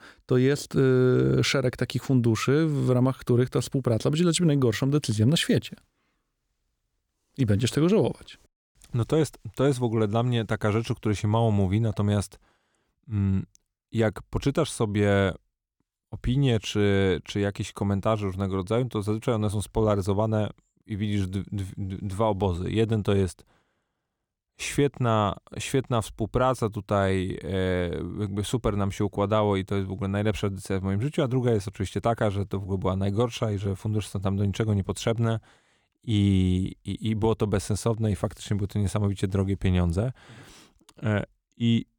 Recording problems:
none

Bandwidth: 19 kHz